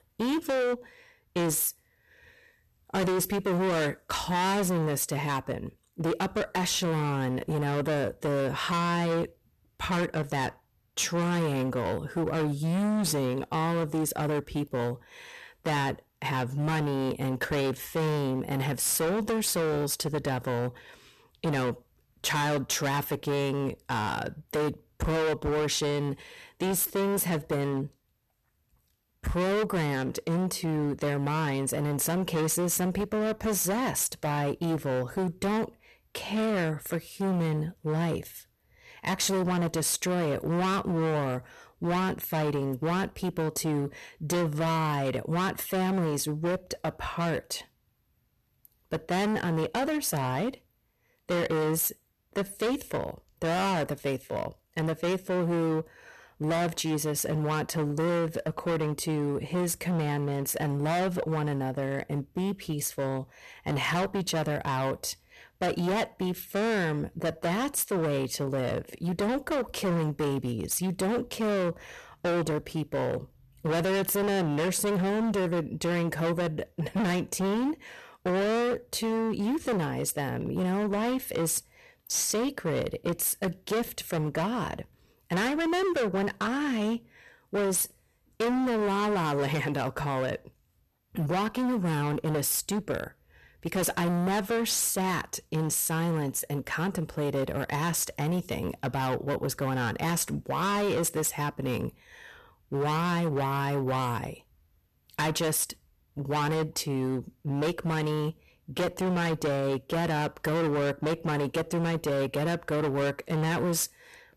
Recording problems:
distortion; heavy; 23% of the sound clipped

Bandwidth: 13.5 kHz